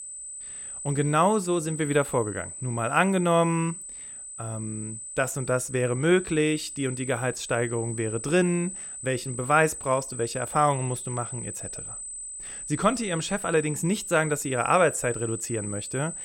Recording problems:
high-pitched whine; loud; throughout; 8 kHz, 9 dB below the speech

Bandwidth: 16.5 kHz